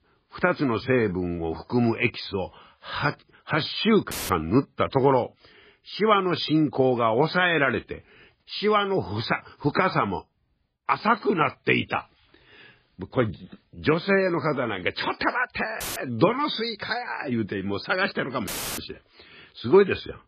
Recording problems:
garbled, watery; badly
audio cutting out; filled with static; at 4 s, at 16 s and at 18 s

